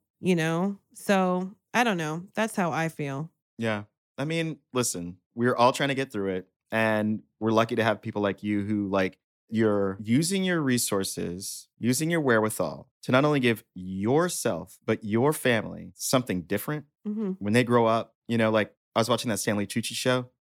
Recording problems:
none

